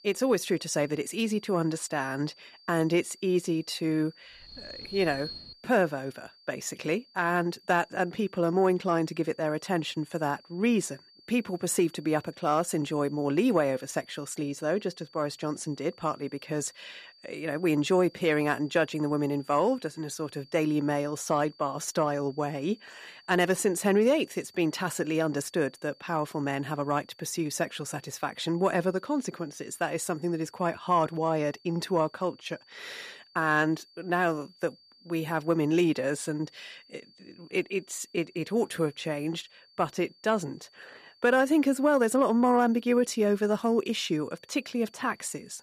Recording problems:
high-pitched whine; faint; throughout; 4.5 kHz, 25 dB below the speech
alarm; noticeable; from 4.5 to 5.5 s; peak 10 dB below the speech

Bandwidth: 14.5 kHz